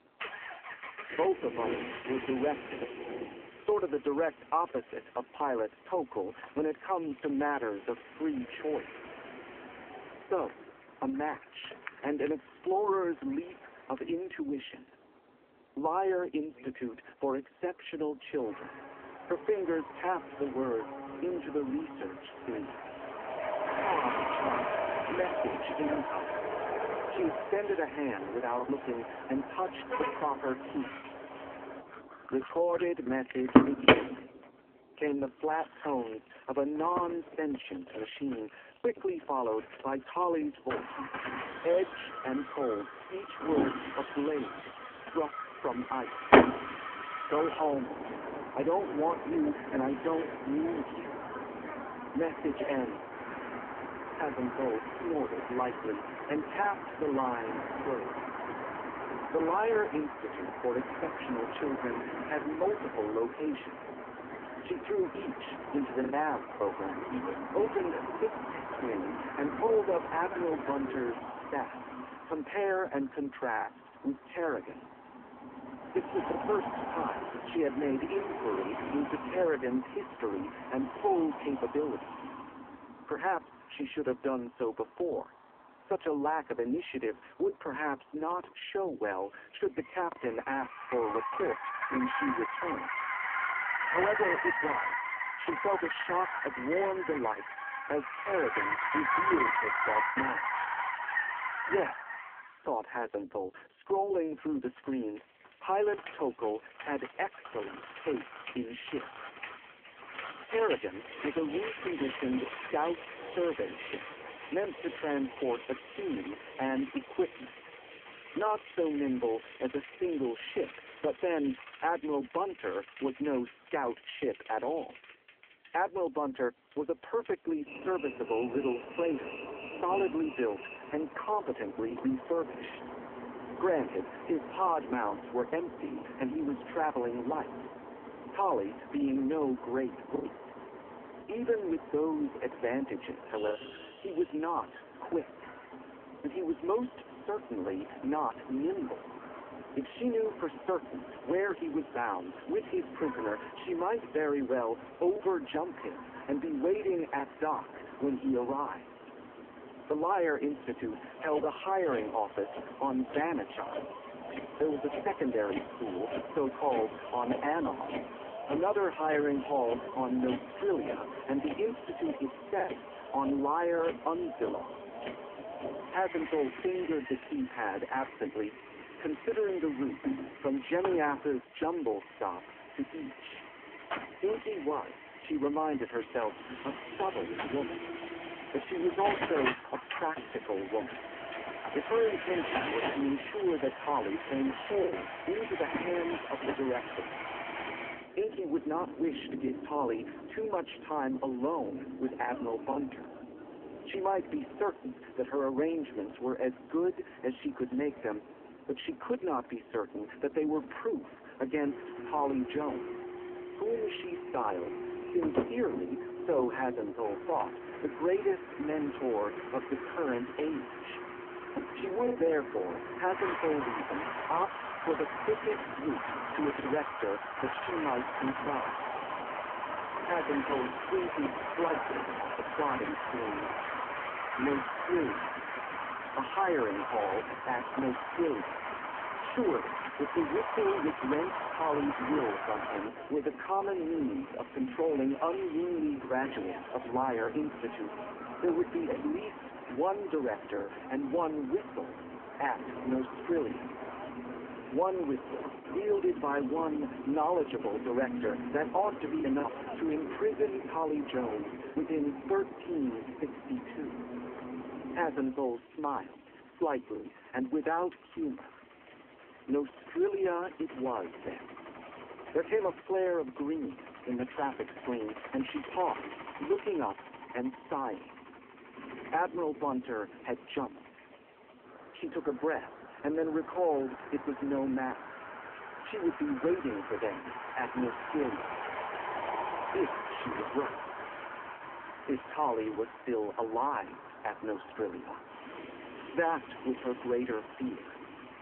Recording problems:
phone-call audio; poor line
traffic noise; loud; throughout; 4 dB below the speech
choppy; occasionally; 1% of the speech affected

